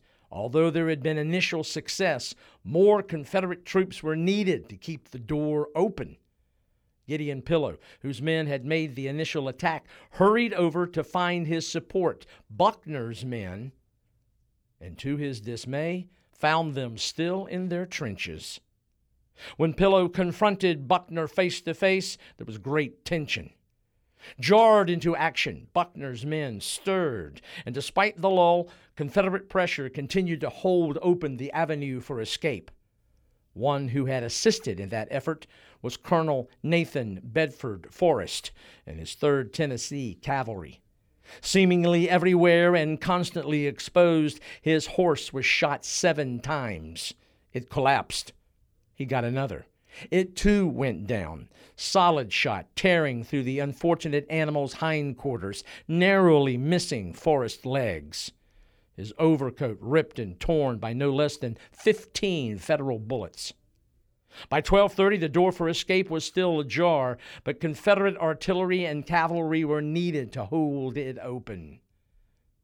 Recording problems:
none

